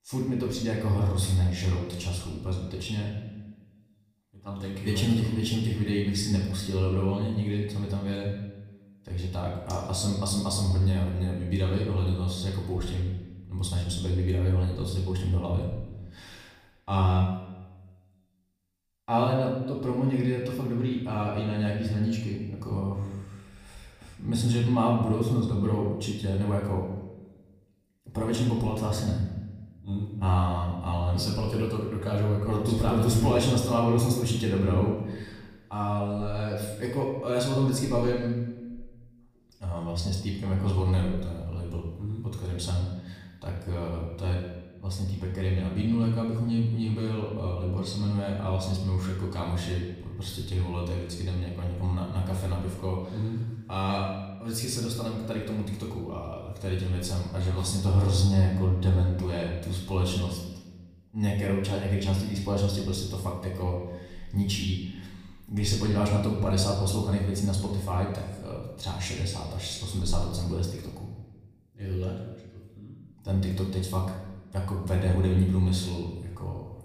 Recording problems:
off-mic speech; far
room echo; noticeable; dies away in 1 s

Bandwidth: 15 kHz